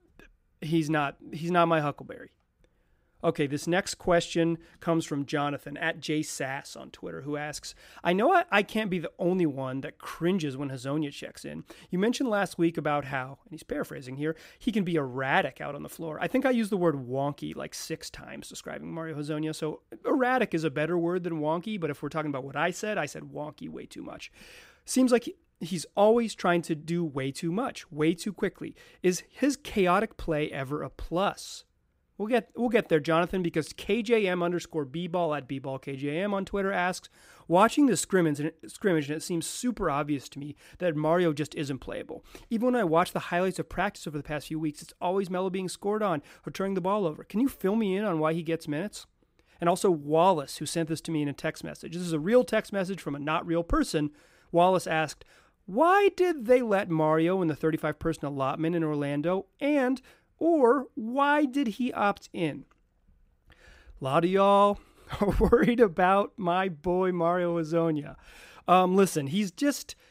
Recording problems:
none

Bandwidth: 15.5 kHz